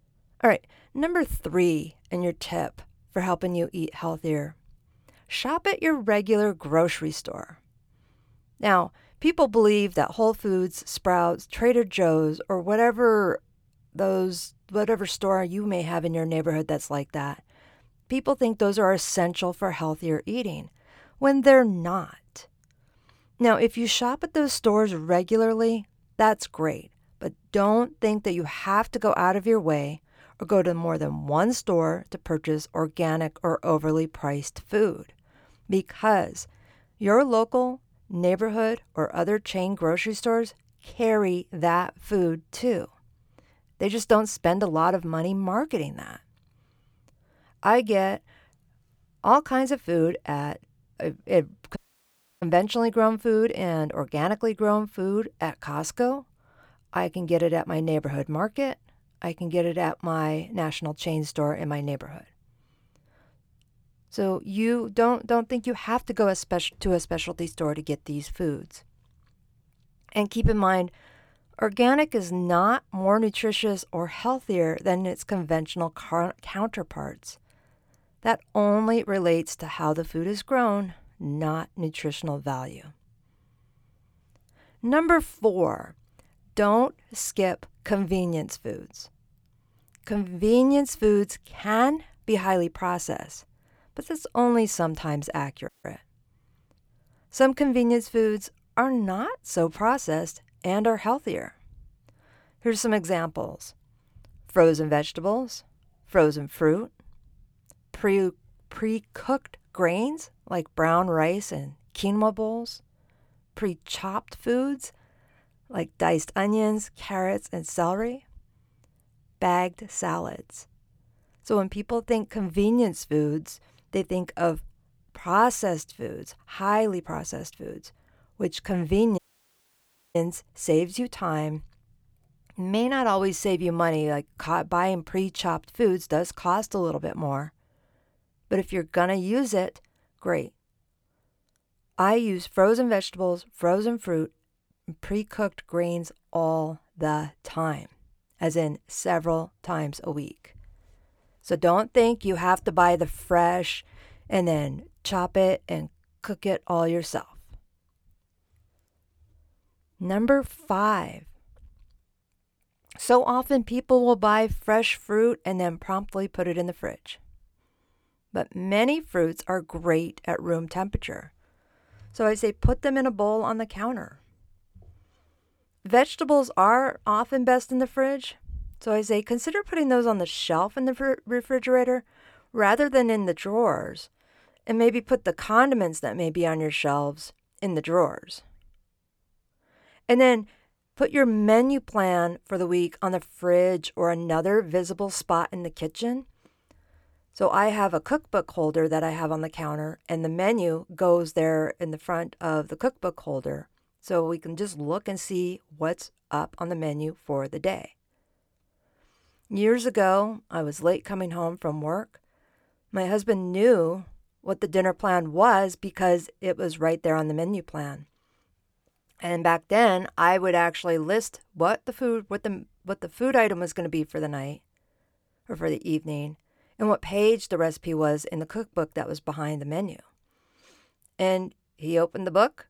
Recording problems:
audio cutting out; at 52 s for 0.5 s, at 1:36 and at 2:09 for 1 s

